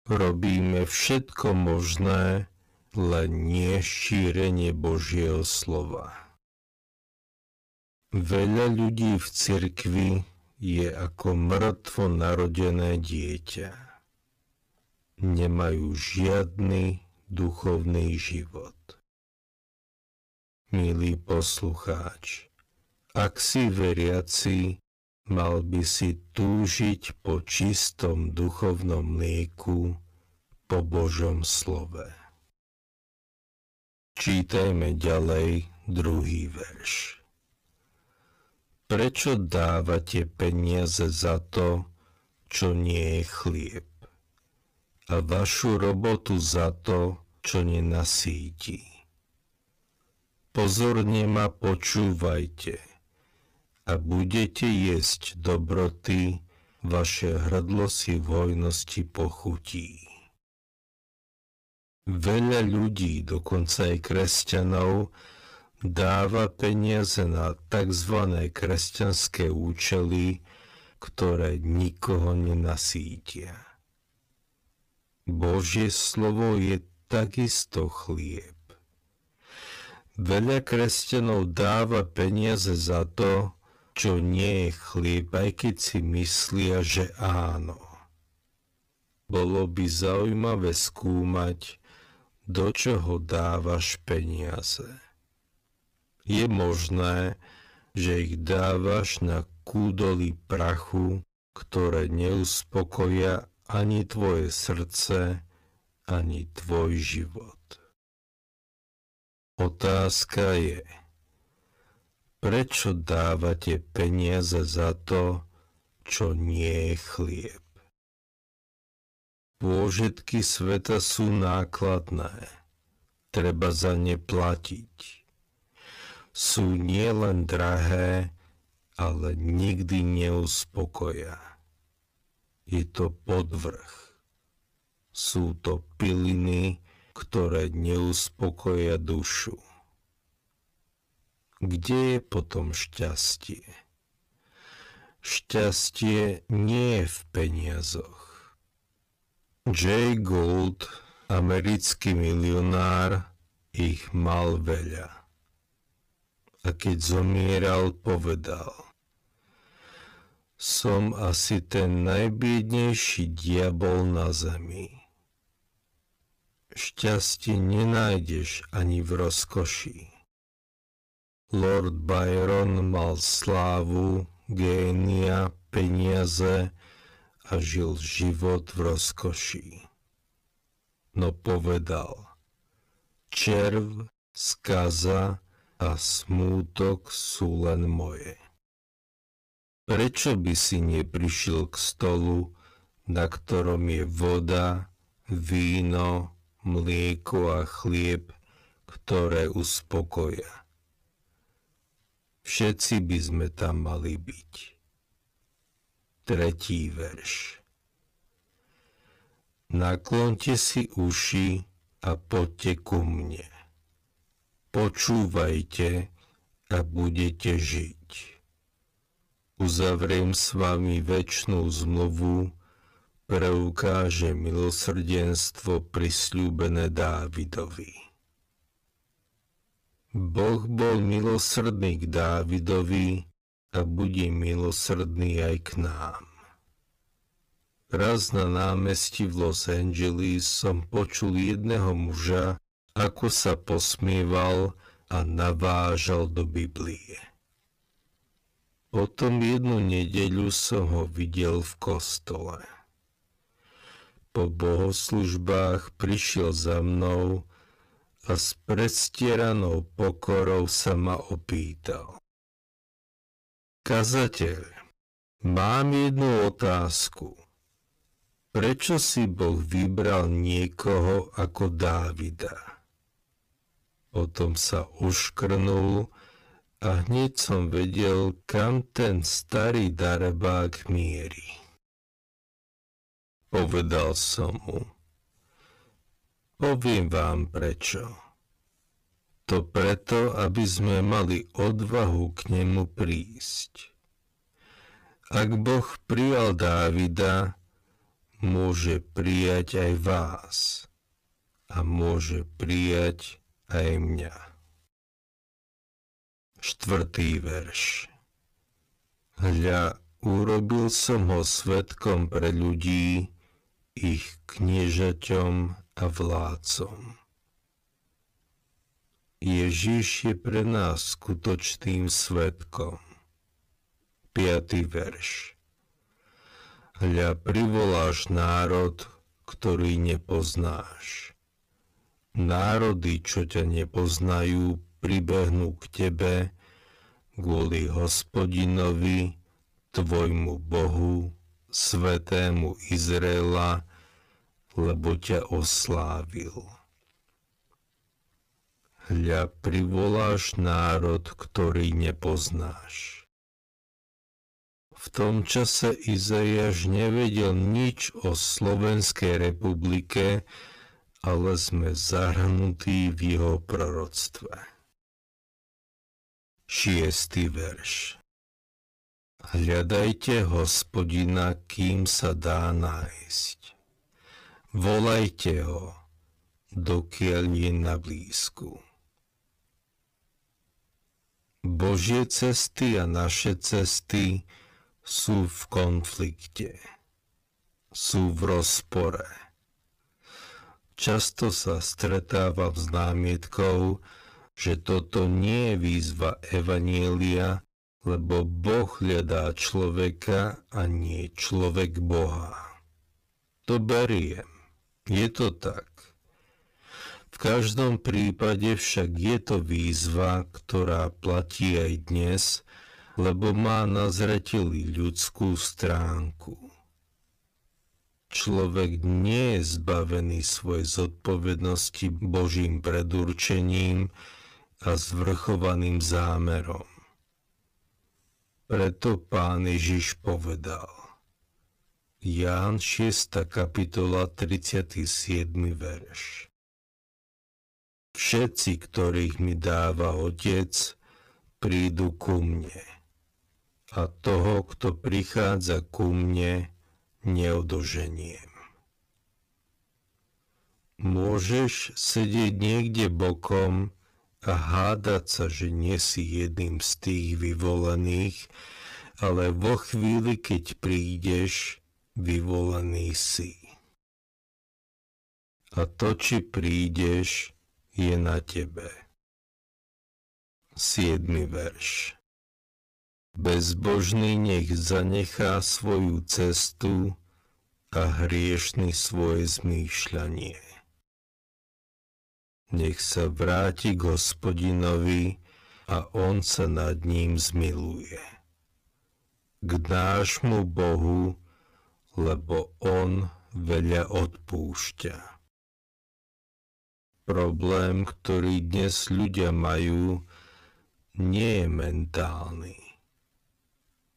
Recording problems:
wrong speed, natural pitch; too slow; 0.6 times normal speed
distortion; slight; 8% of the sound clipped

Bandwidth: 15 kHz